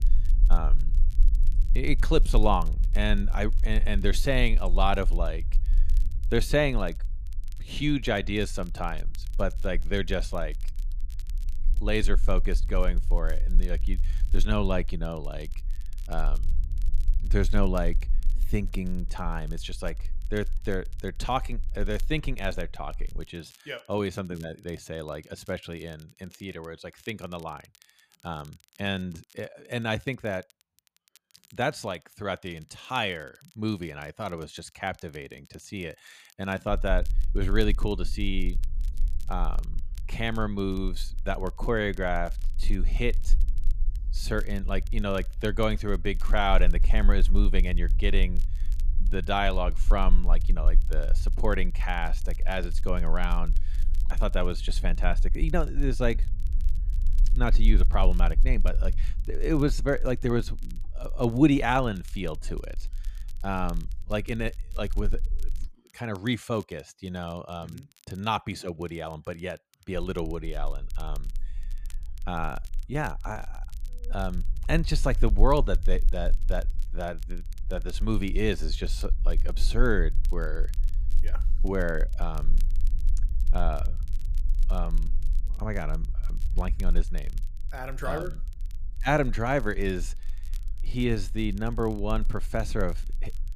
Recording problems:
low rumble; faint; until 23 s, from 37 s to 1:06 and from 1:10 on; 25 dB below the speech
crackle, like an old record; faint; 25 dB below the speech

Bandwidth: 14.5 kHz